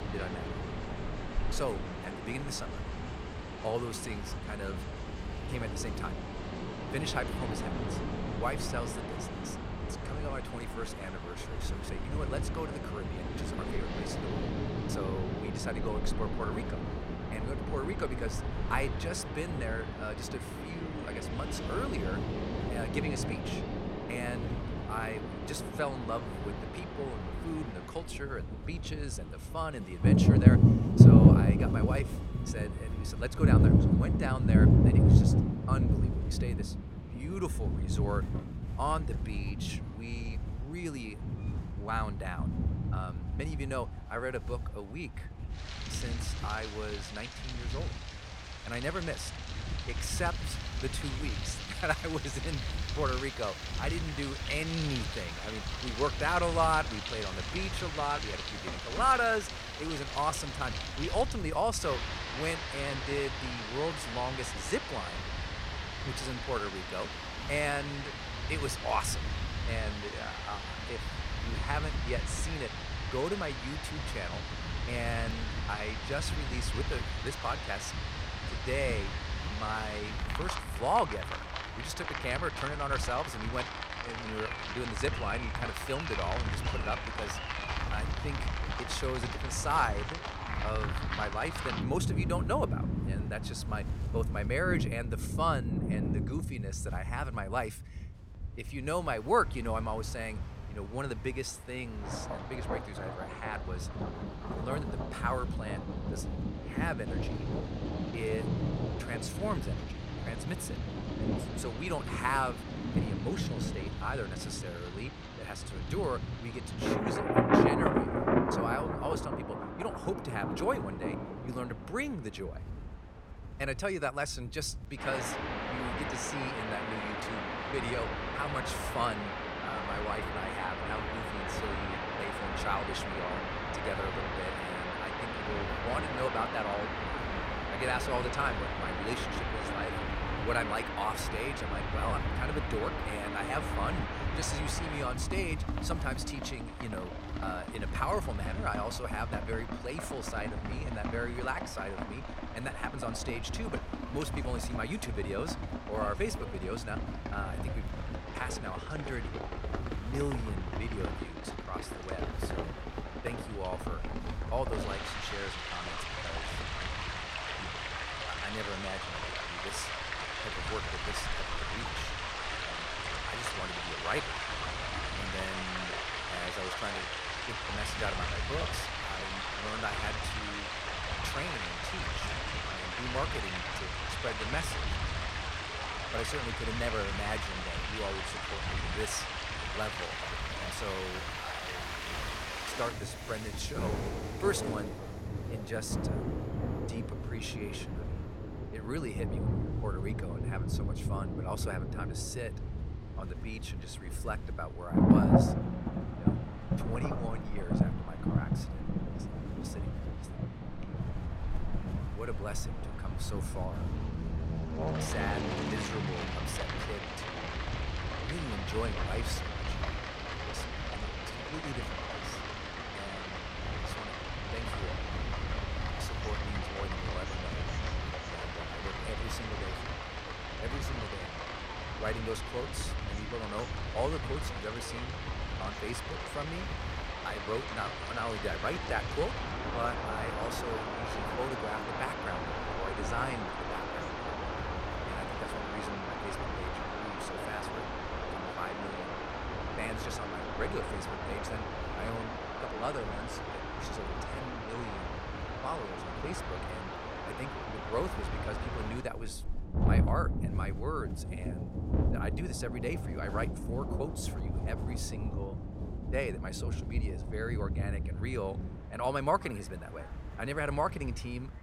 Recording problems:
rain or running water; very loud; throughout; 3 dB above the speech
train or aircraft noise; noticeable; throughout; 15 dB below the speech
wind noise on the microphone; occasional gusts; 20 dB below the speech

